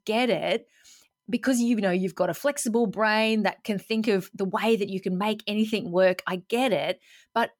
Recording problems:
none

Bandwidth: 18 kHz